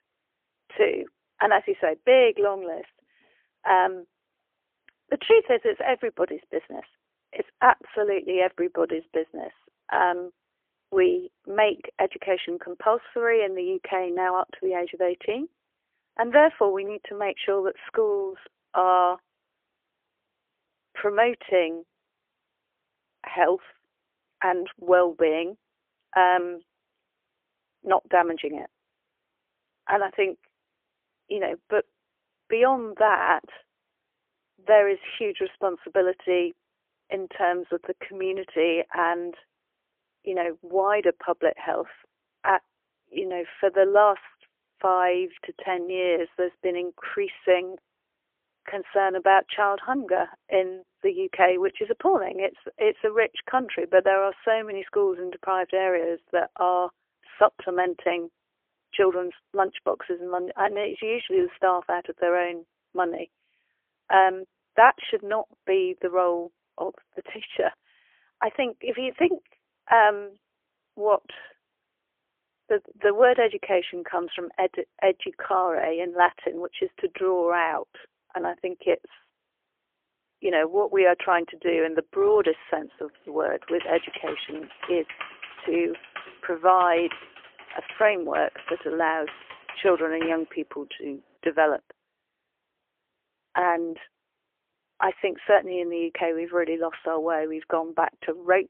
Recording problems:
phone-call audio; poor line; nothing above 3.5 kHz
keyboard typing; faint; from 1:24 to 1:30; peak 10 dB below the speech

